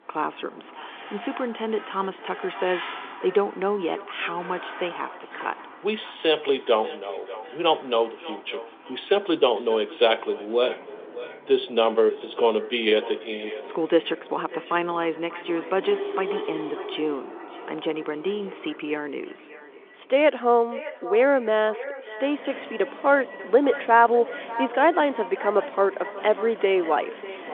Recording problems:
echo of what is said; noticeable; throughout; 590 ms later, 15 dB below the speech
phone-call audio; nothing above 3.5 kHz
traffic noise; noticeable; throughout; 15 dB below the speech

